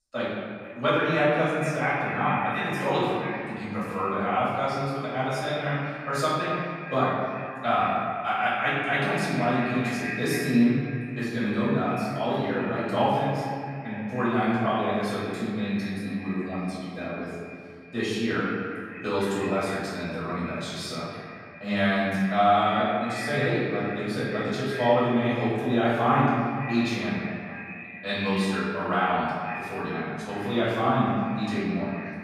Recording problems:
echo of what is said; strong; throughout; 460 ms later, 10 dB below the speech
room echo; strong; dies away in 1.8 s
off-mic speech; far

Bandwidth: 15 kHz